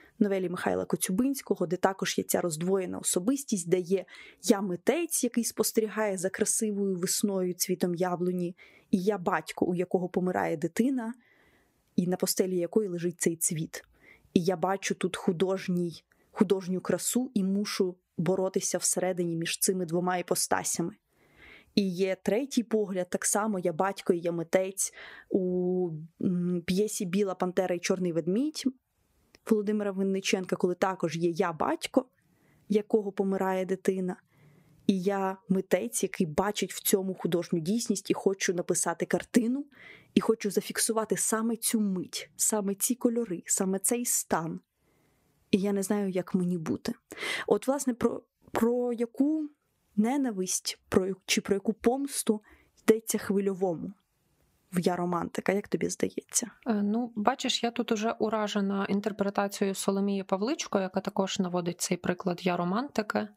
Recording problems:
squashed, flat; somewhat

